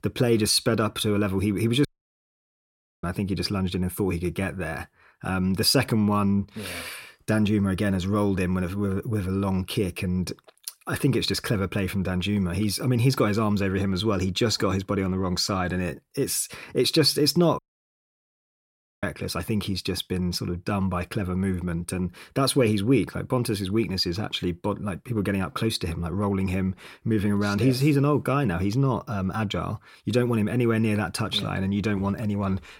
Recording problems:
audio cutting out; at 2 s for 1 s and at 18 s for 1.5 s

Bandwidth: 16 kHz